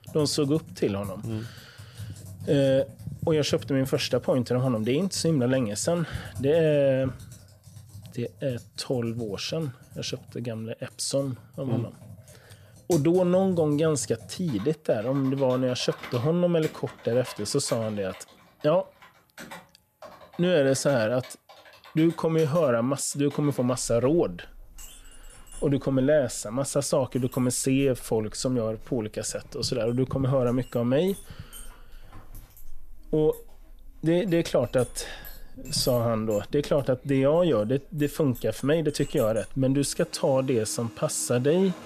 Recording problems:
household noises; faint; throughout; 20 dB below the speech

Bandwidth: 14.5 kHz